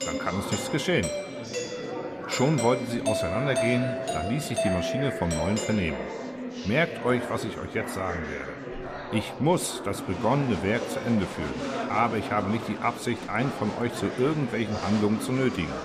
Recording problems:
murmuring crowd; loud; throughout; 7 dB below the speech
doorbell; noticeable; until 6 s; peak level with the speech

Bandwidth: 14.5 kHz